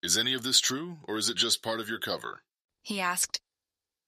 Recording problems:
thin; somewhat; fading below 750 Hz

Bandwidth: 14.5 kHz